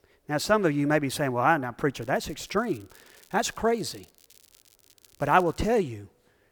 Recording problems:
crackling; faint; from 2 to 6 s; 30 dB below the speech

